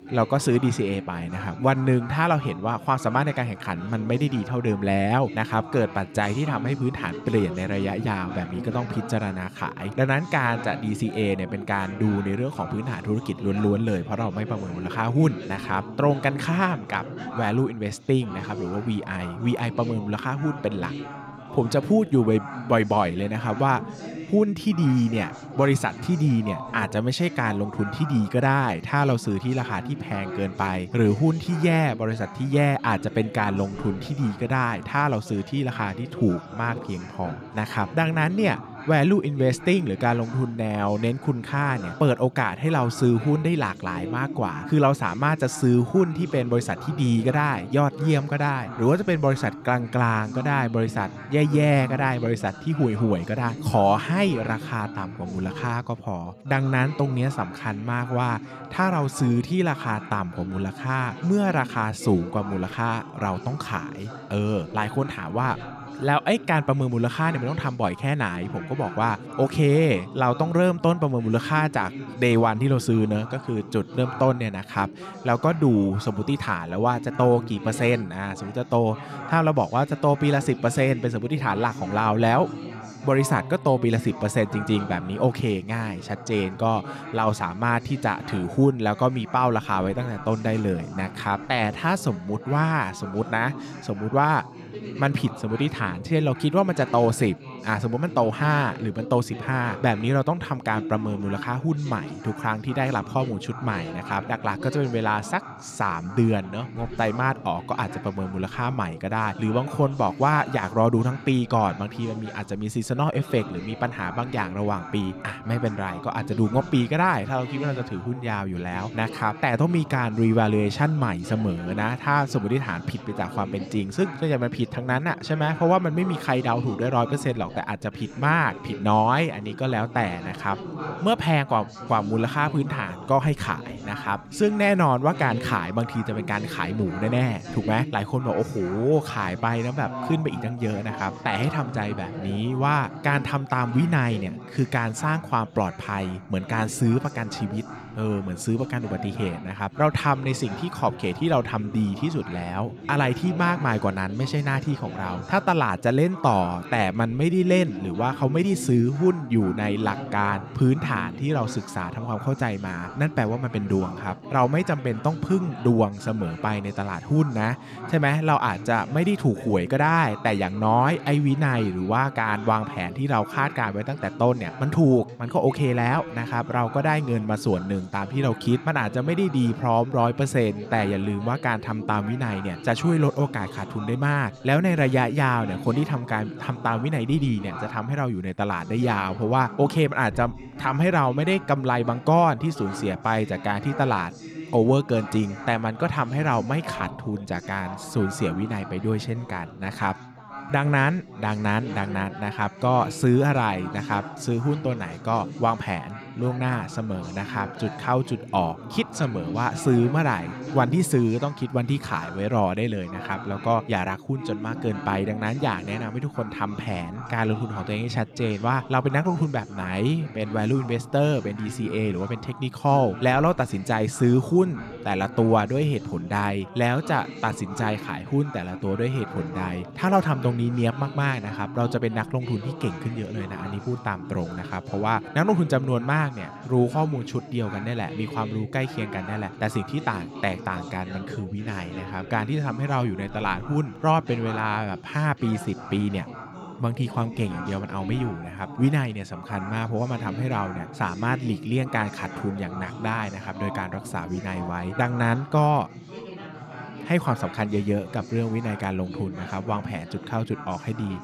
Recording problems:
background chatter; noticeable; throughout; 4 voices, 15 dB below the speech

